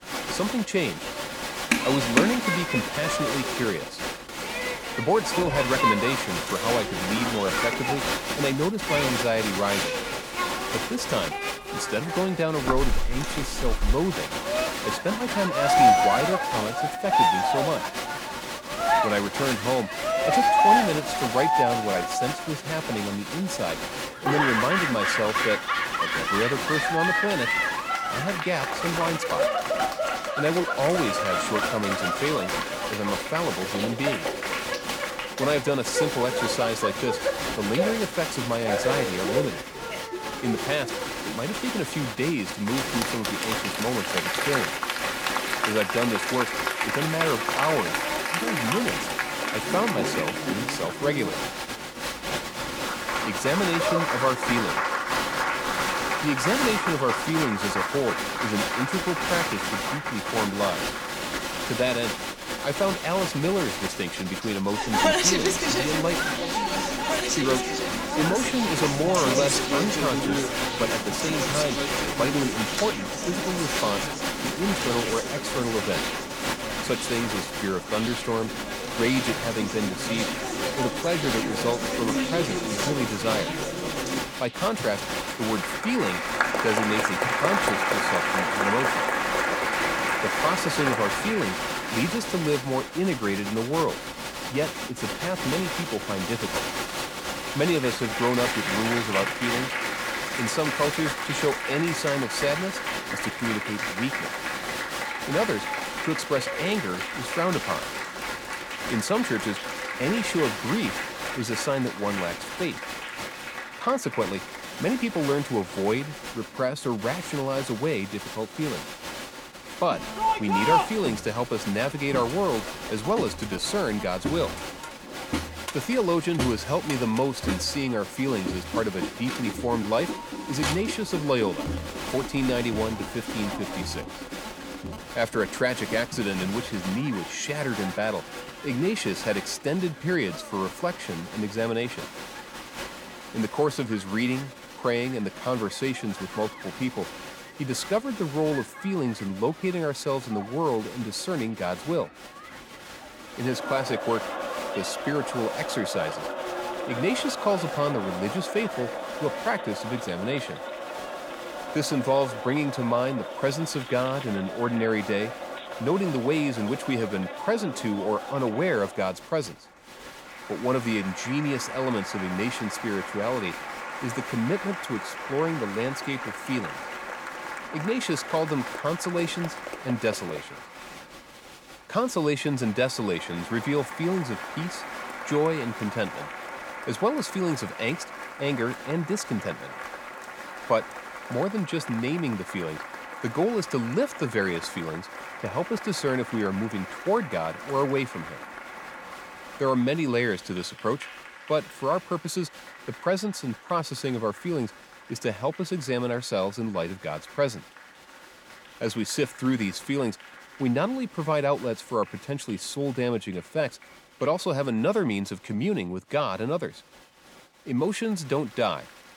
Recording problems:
crowd noise; loud; throughout; as loud as the speech

